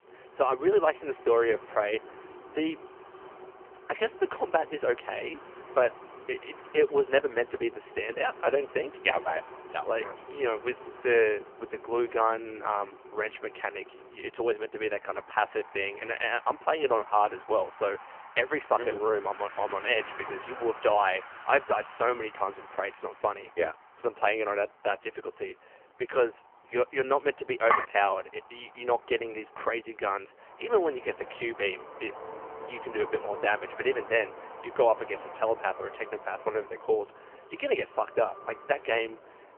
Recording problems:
phone-call audio; poor line; nothing above 3 kHz
traffic noise; noticeable; throughout; 15 dB below the speech
clattering dishes; loud; at 28 s; peak 1 dB above the speech

